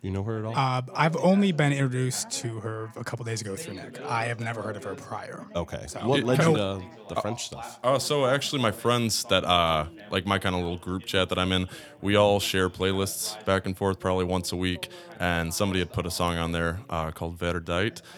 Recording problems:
background chatter; noticeable; throughout; 2 voices, 20 dB below the speech

